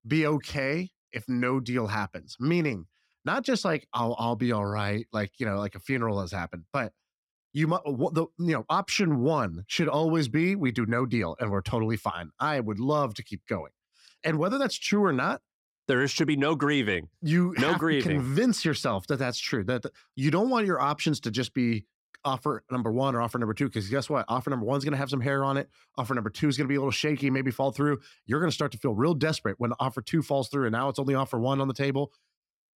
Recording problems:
none

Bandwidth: 16.5 kHz